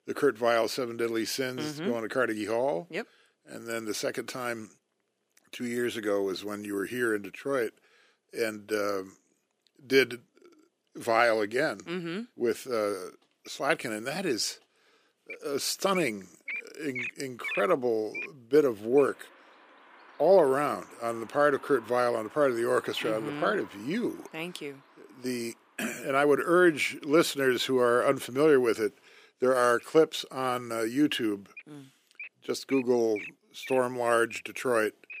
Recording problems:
thin; somewhat; fading below 300 Hz
animal sounds; noticeable; from 14 s on; 15 dB below the speech

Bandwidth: 15 kHz